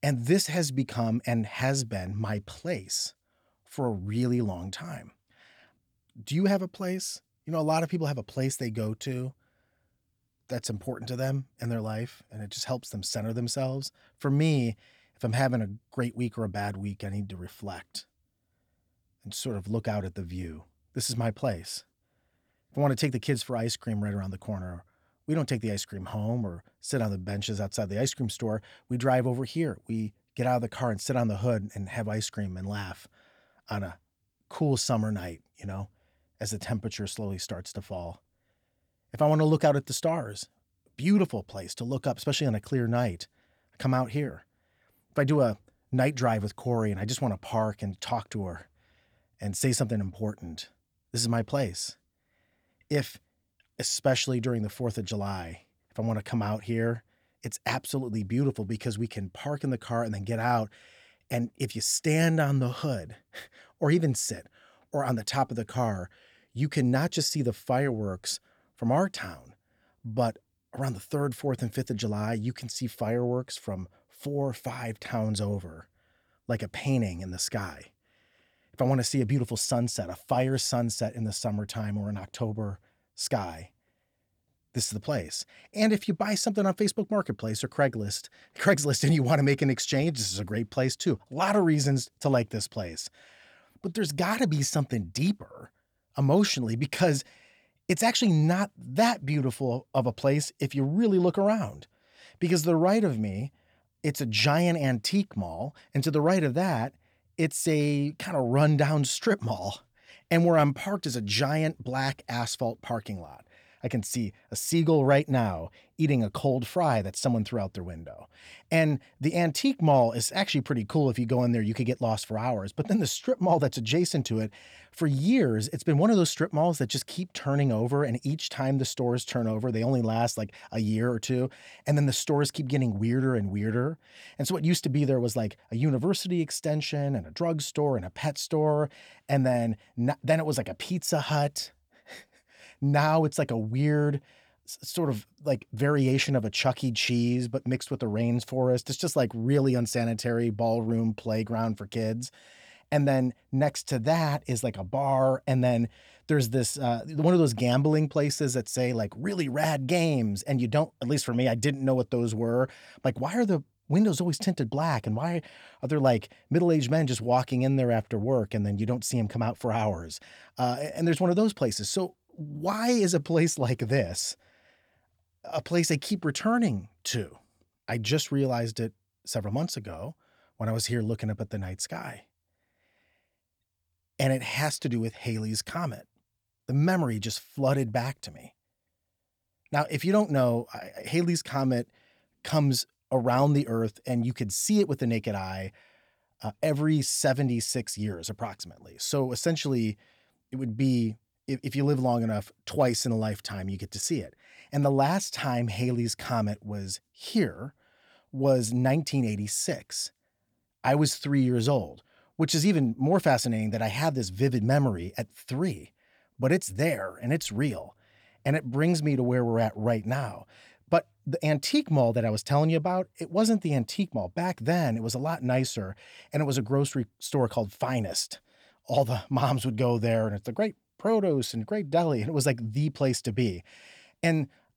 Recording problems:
none

